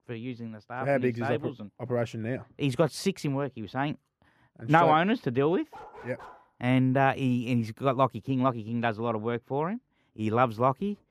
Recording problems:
muffled; slightly; fading above 1.5 kHz
dog barking; faint; at 5.5 s; peak 20 dB below the speech

